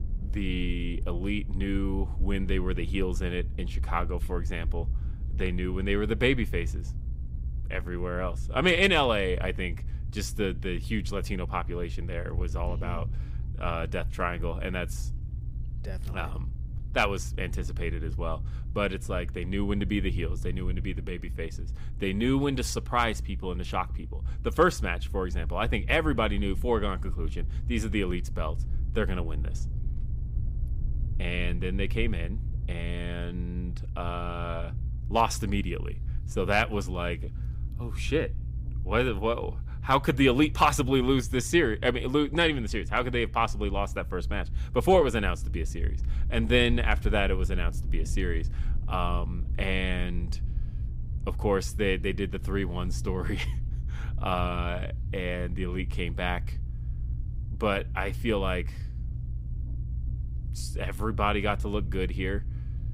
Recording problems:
low rumble; faint; throughout; 20 dB below the speech

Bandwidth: 15.5 kHz